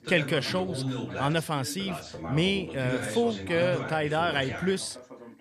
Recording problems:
background chatter; loud; throughout; 2 voices, 7 dB below the speech

